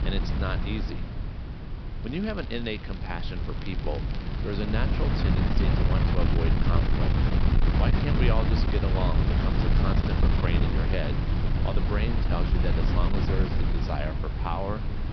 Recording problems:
high frequencies cut off; noticeable; nothing above 5.5 kHz
wind noise on the microphone; heavy; as loud as the speech
crackling; noticeable; from 2 to 5 s and from 9 to 10 s; 15 dB below the speech

